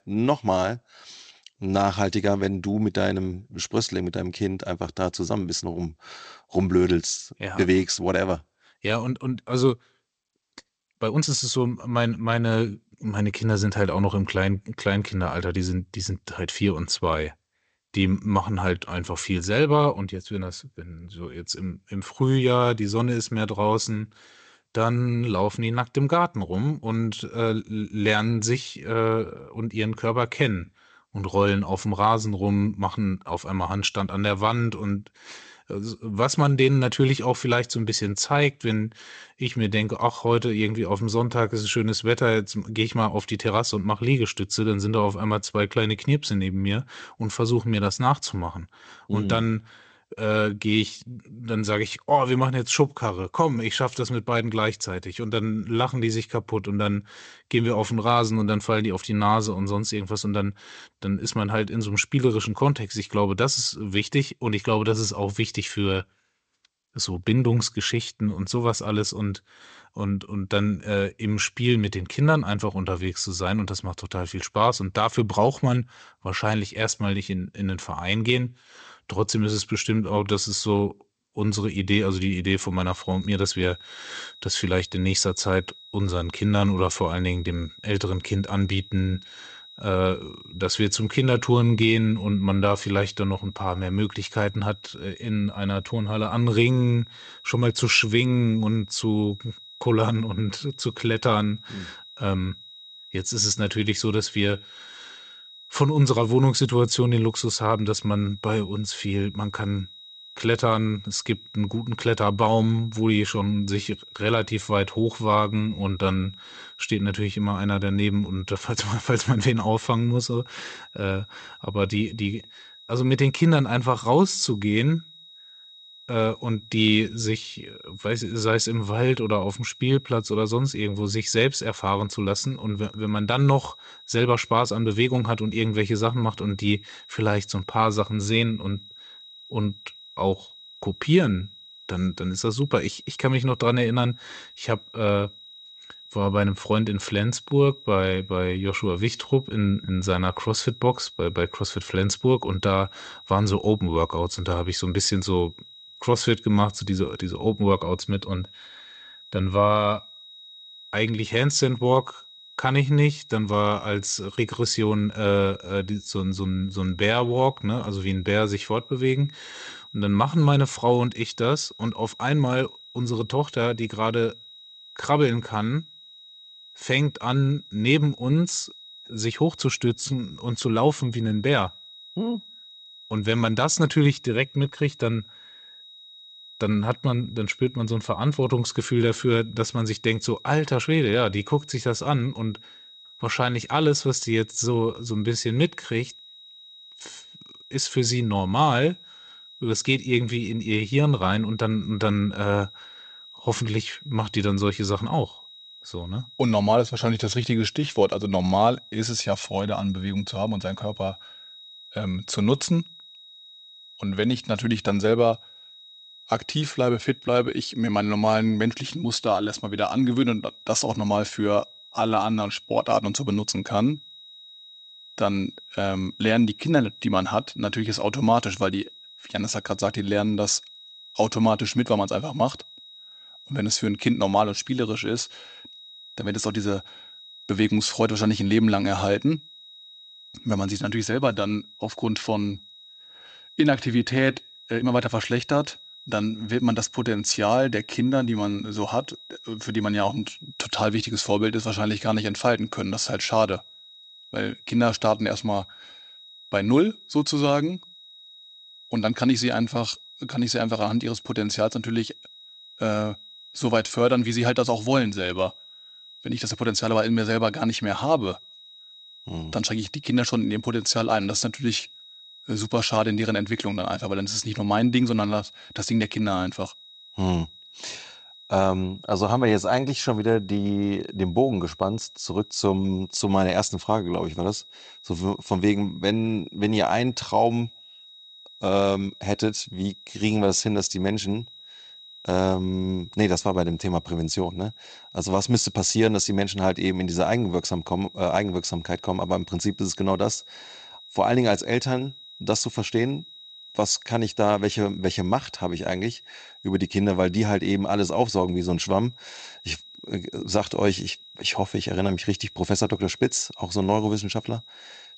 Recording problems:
garbled, watery; slightly; nothing above 8 kHz
high-pitched whine; noticeable; from 1:23 on; 4 kHz, 20 dB below the speech
uneven, jittery; strongly; from 11 s to 4:05

